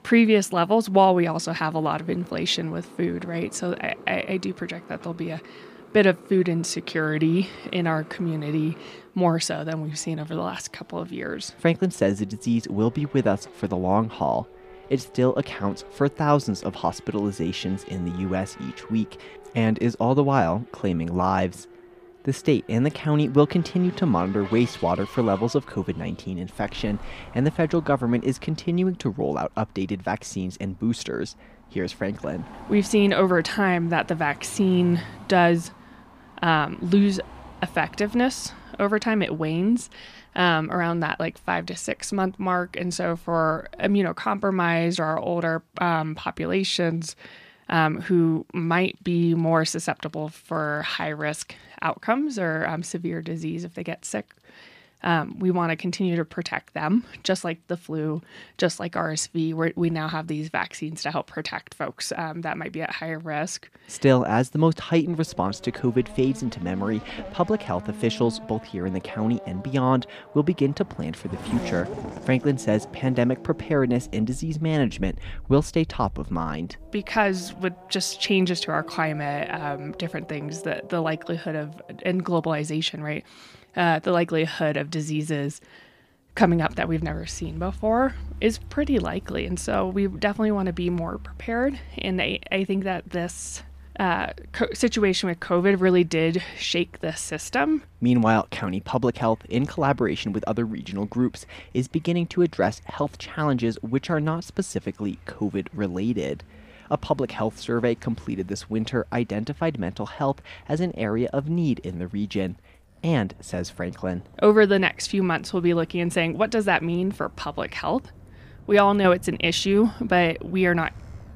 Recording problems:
traffic noise; noticeable; throughout; 20 dB below the speech

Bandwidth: 15 kHz